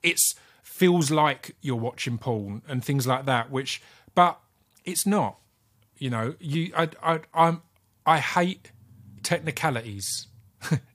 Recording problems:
none

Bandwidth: 15 kHz